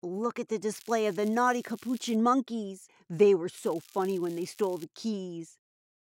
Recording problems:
crackling; faint; from 0.5 to 2 s and from 3.5 to 5 s; 25 dB below the speech

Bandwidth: 16 kHz